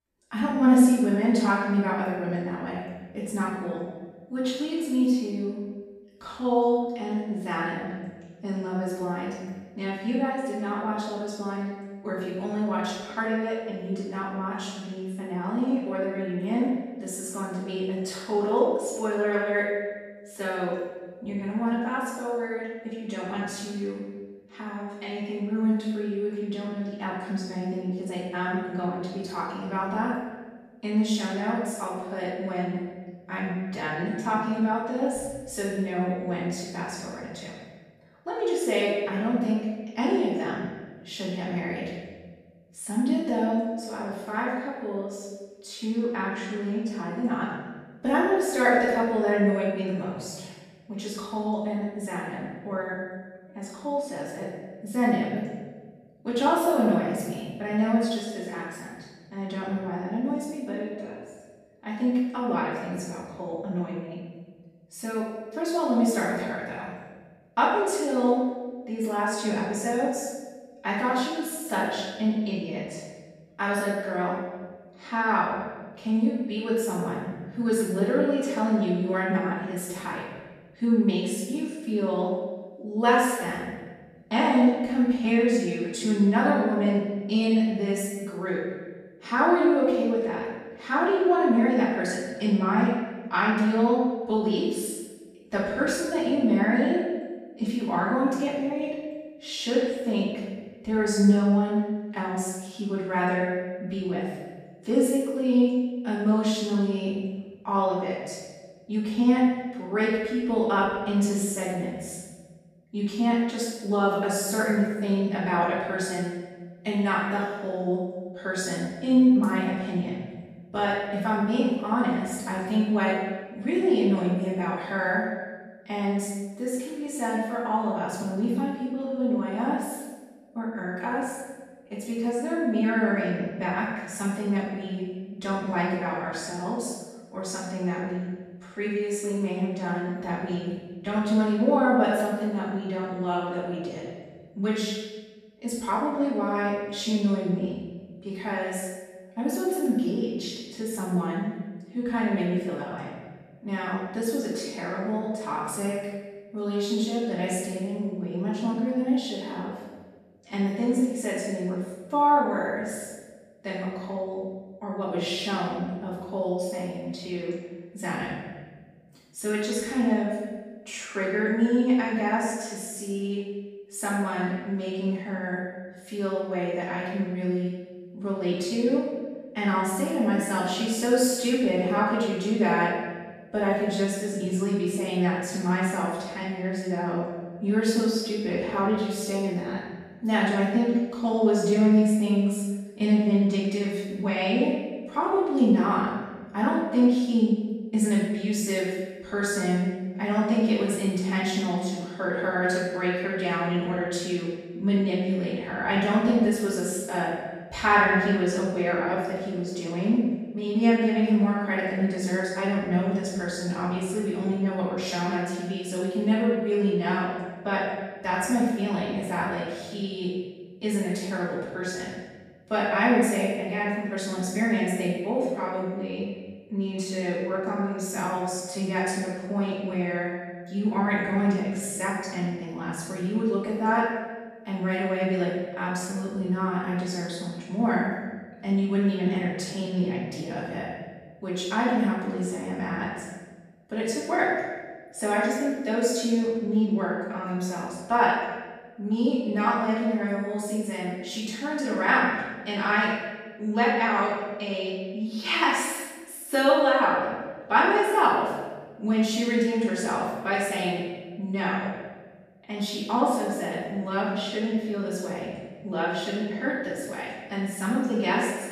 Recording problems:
room echo; strong; dies away in 1.2 s
off-mic speech; far

